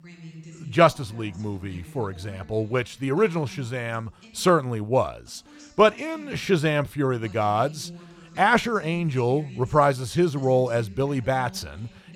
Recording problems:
voice in the background; faint; throughout; 20 dB below the speech

